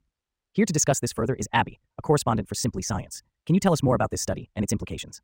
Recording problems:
wrong speed, natural pitch; too fast; 1.7 times normal speed

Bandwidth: 16 kHz